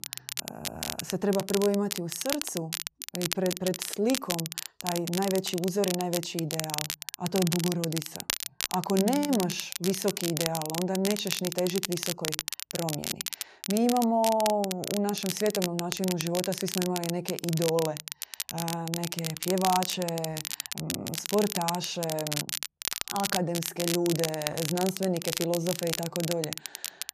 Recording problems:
crackle, like an old record; loud; 4 dB below the speech

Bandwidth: 14.5 kHz